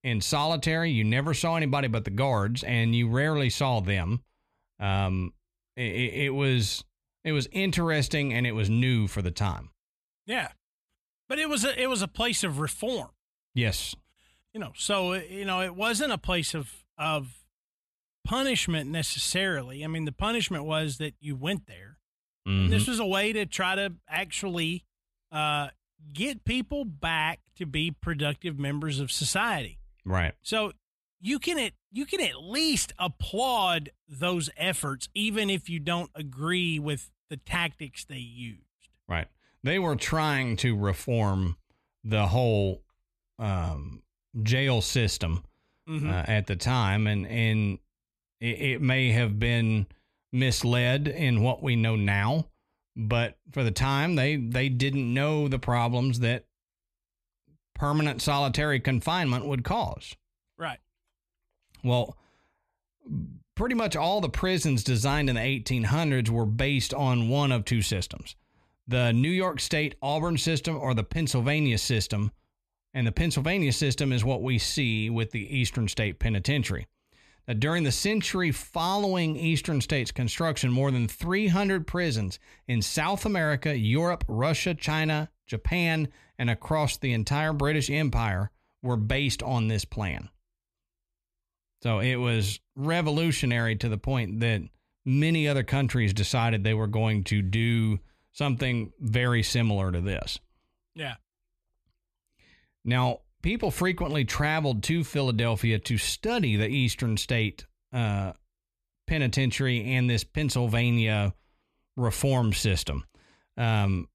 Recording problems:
none

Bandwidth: 14 kHz